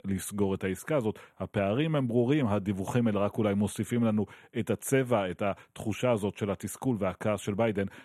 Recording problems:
none

